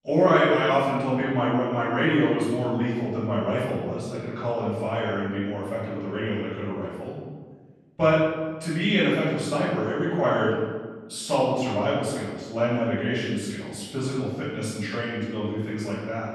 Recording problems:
room echo; strong; dies away in 1.3 s
off-mic speech; far

